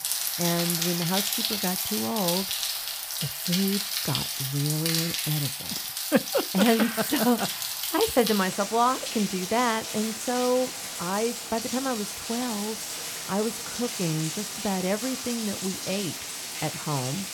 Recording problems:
rain or running water; loud; throughout; 1 dB below the speech

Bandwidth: 18.5 kHz